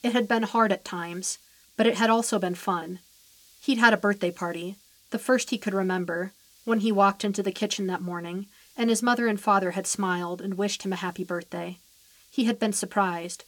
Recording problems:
hiss; faint; throughout; 30 dB below the speech

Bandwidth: 18 kHz